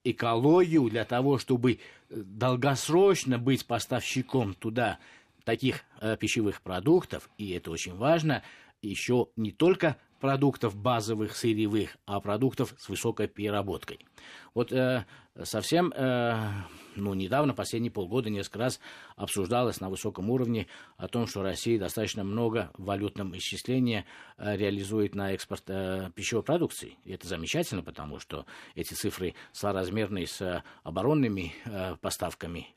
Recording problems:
uneven, jittery; strongly; from 4 to 31 s

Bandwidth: 14.5 kHz